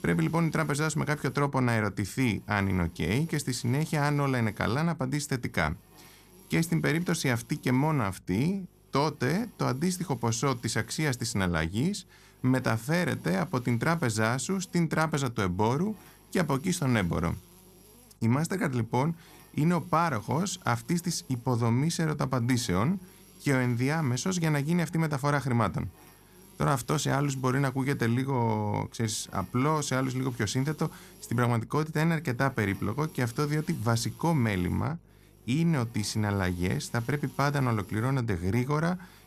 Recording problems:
electrical hum; faint; throughout; 50 Hz, 25 dB below the speech

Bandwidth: 14.5 kHz